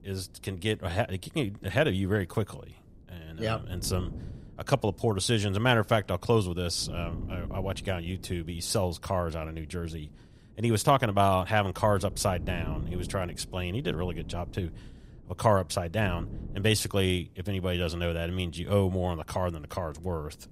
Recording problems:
wind noise on the microphone; occasional gusts; 25 dB below the speech

